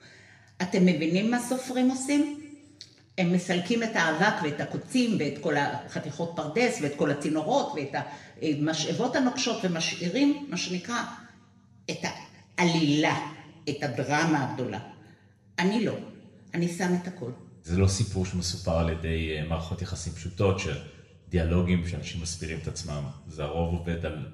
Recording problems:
room echo; slight; dies away in 0.9 s
off-mic speech; somewhat distant

